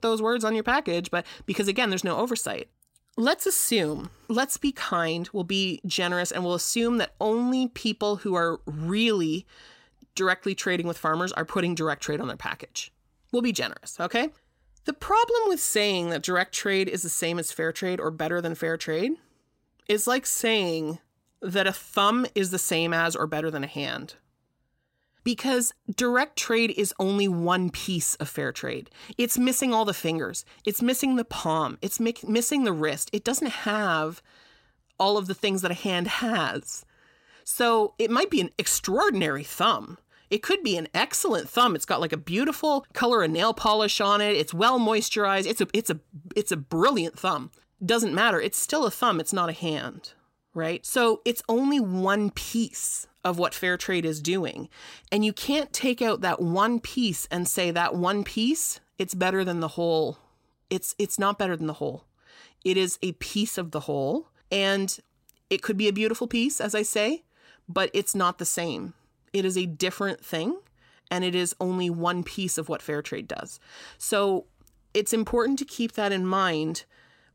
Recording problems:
none

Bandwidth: 16 kHz